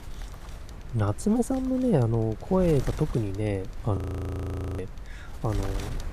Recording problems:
wind noise on the microphone; occasional gusts; 15 dB below the speech
audio freezing; at 4 s for 1 s

